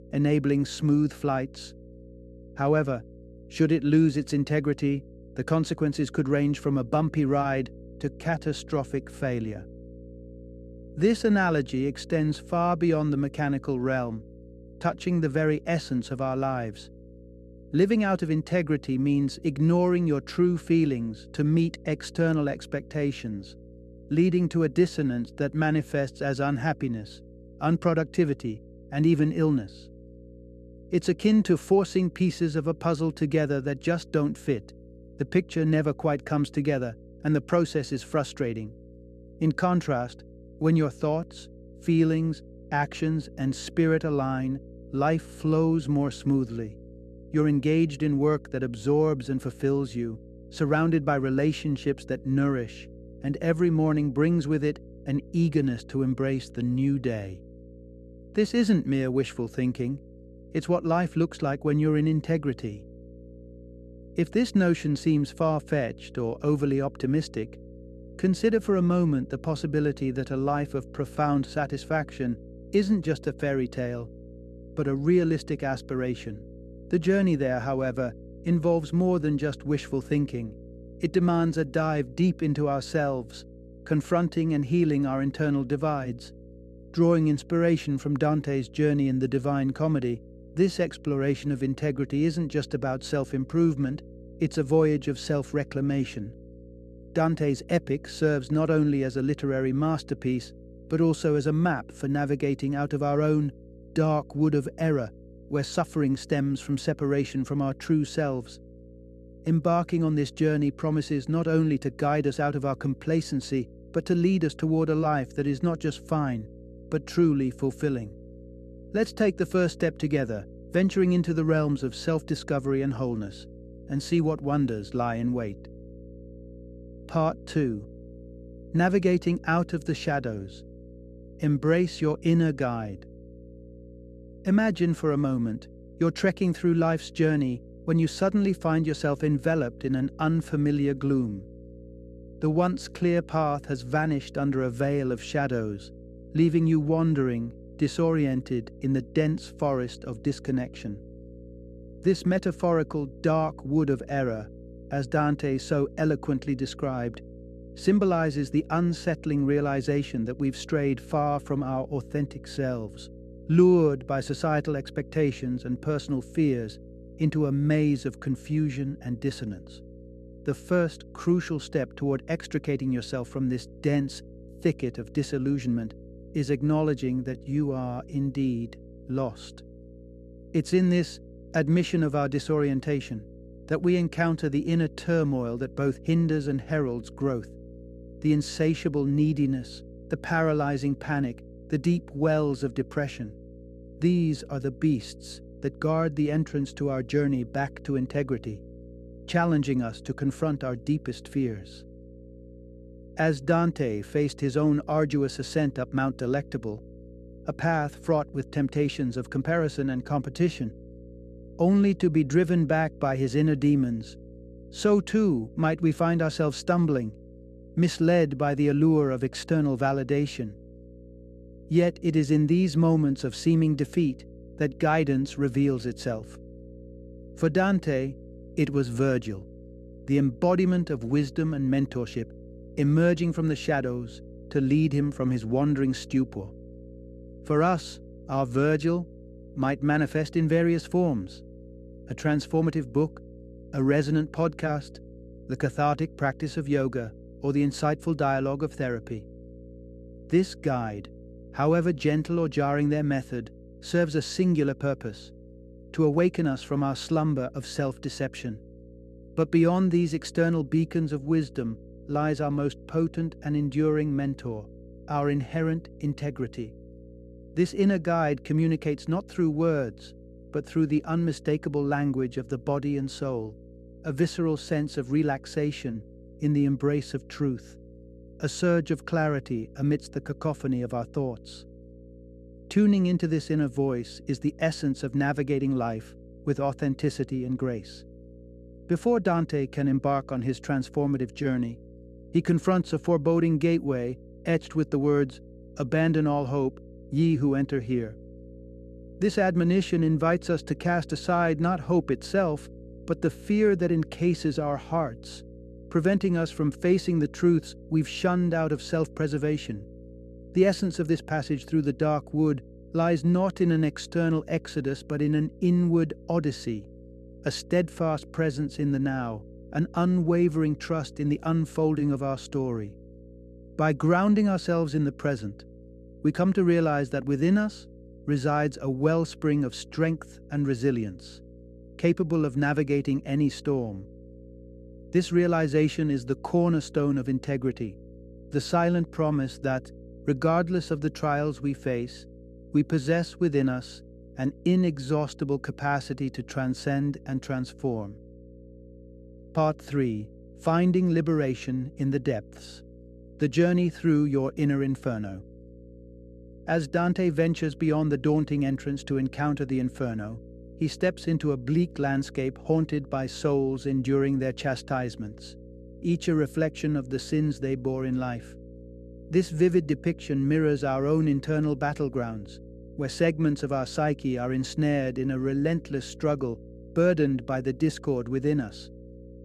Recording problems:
electrical hum; faint; throughout; 60 Hz, 25 dB below the speech

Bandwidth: 13.5 kHz